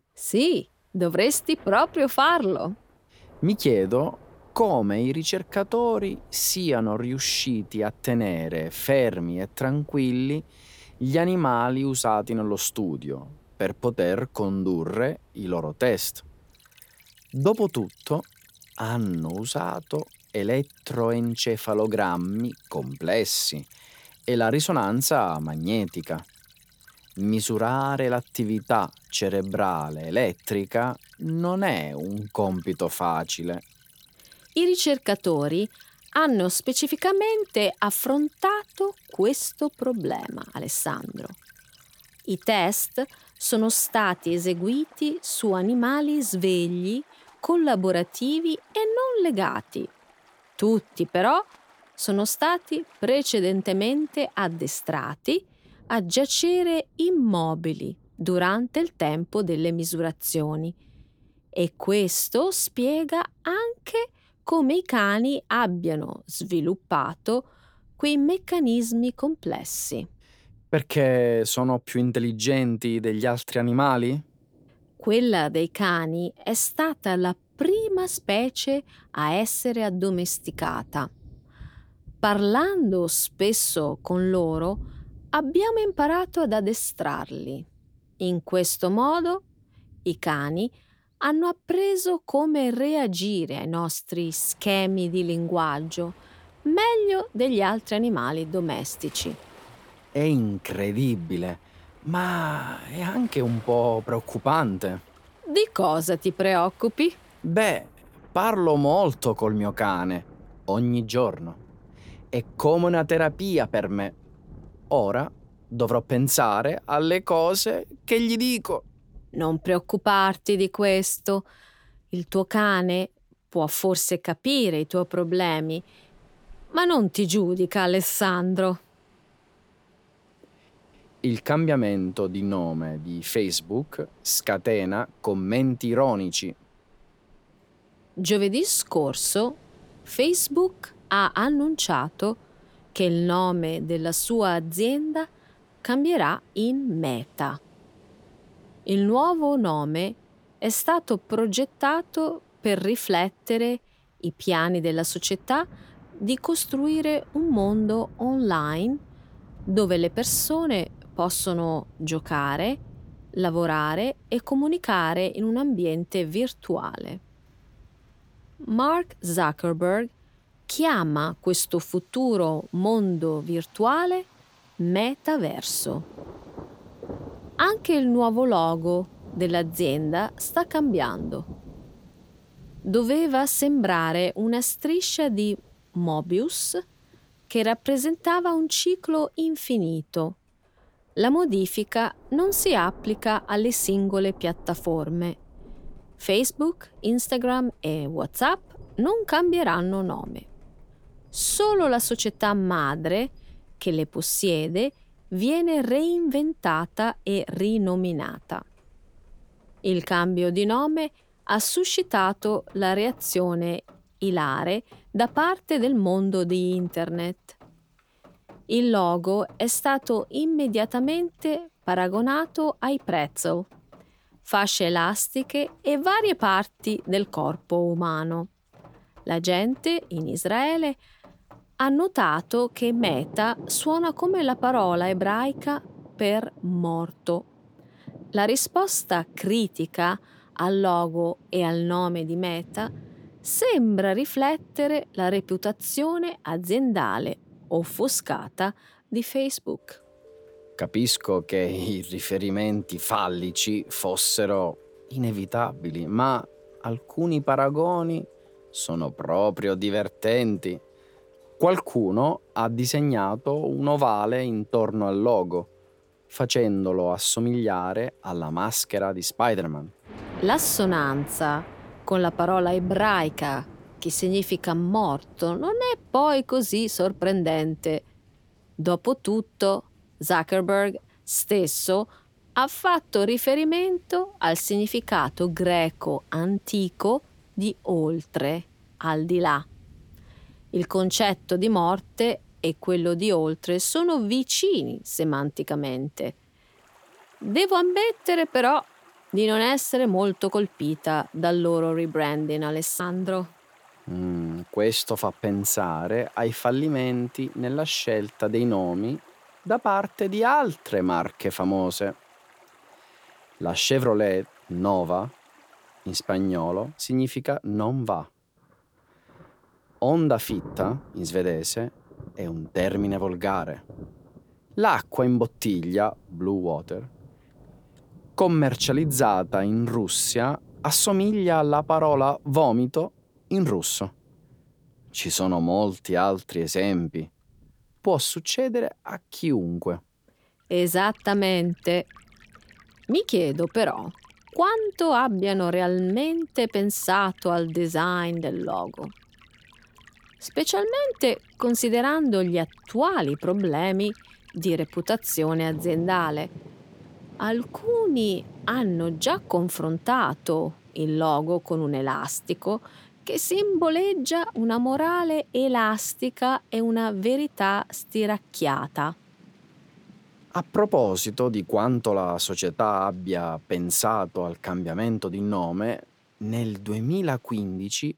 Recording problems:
rain or running water; faint; throughout; 25 dB below the speech

